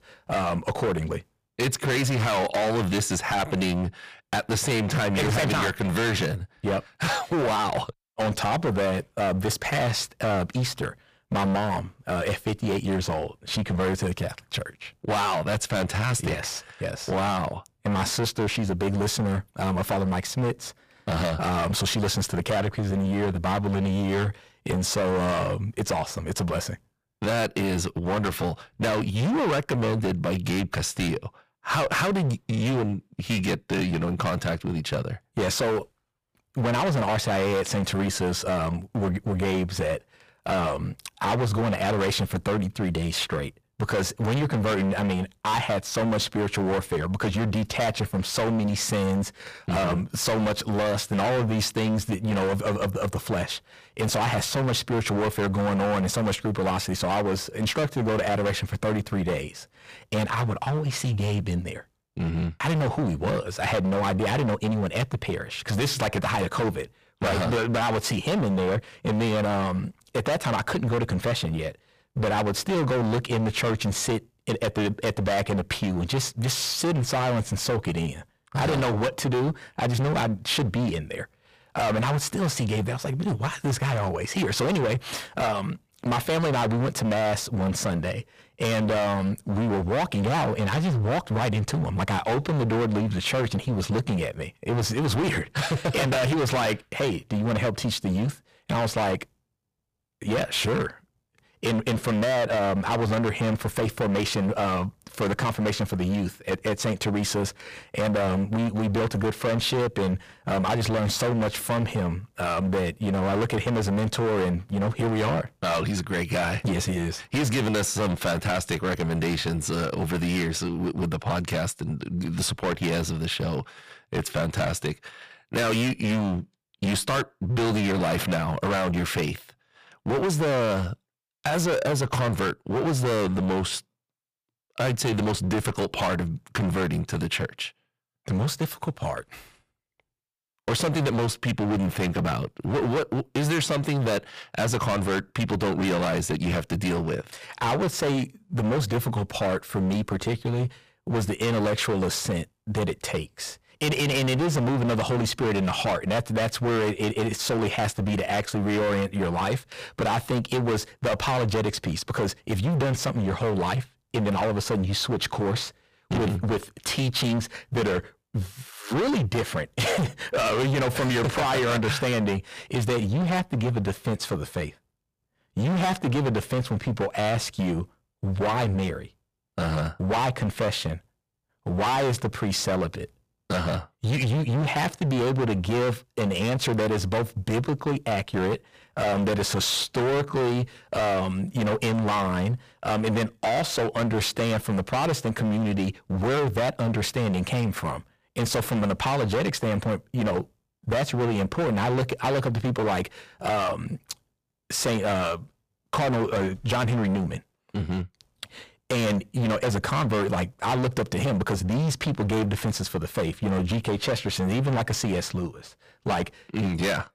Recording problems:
distortion; heavy; 25% of the sound clipped

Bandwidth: 15 kHz